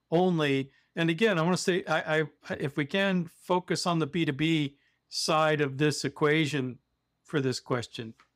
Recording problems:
none

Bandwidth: 15.5 kHz